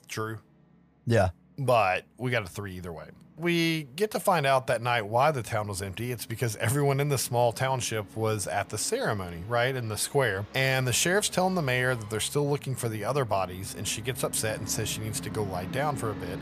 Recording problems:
background music; noticeable; throughout; 20 dB below the speech

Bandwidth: 15 kHz